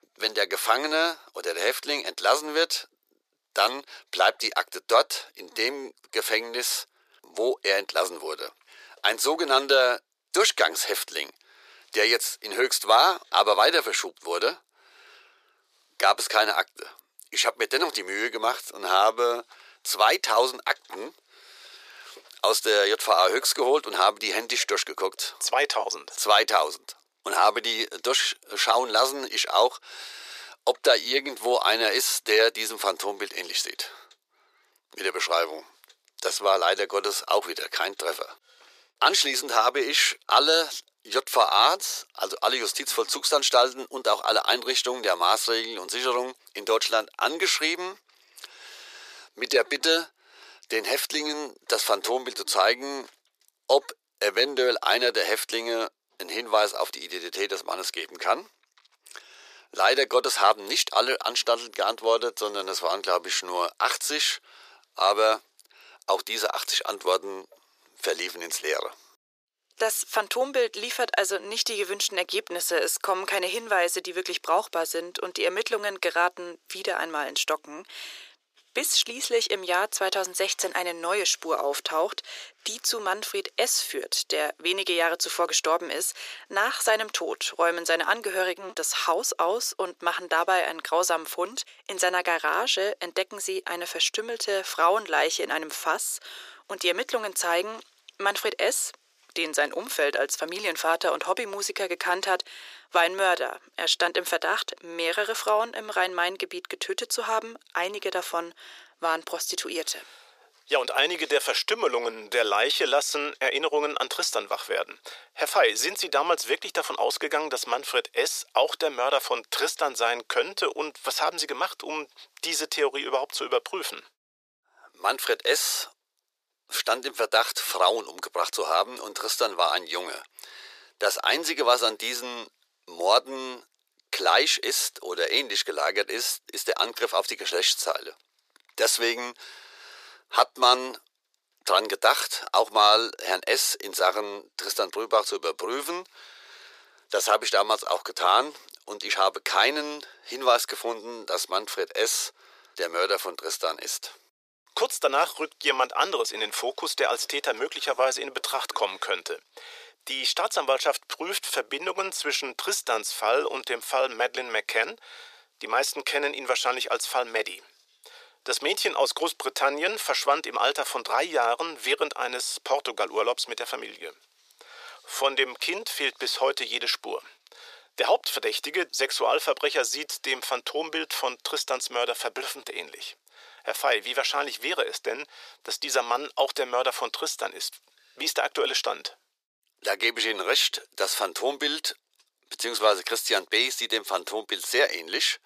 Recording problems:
thin; very; fading below 400 Hz

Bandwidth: 14.5 kHz